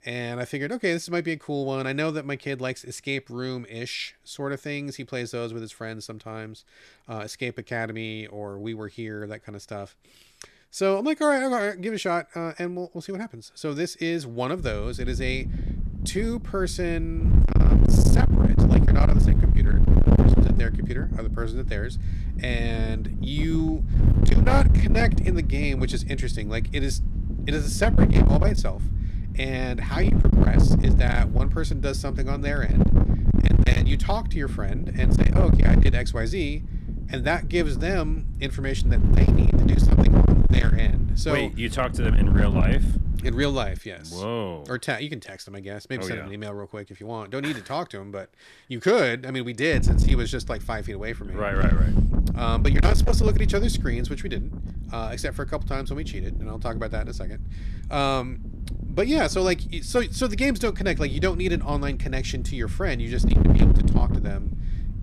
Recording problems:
distortion; heavy; 9% of the sound clipped
wind noise on the microphone; heavy; from 15 to 44 s and from 50 s on; 3 dB below the speech

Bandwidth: 13.5 kHz